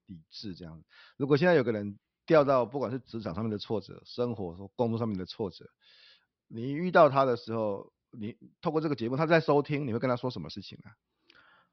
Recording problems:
high frequencies cut off; noticeable; nothing above 5.5 kHz

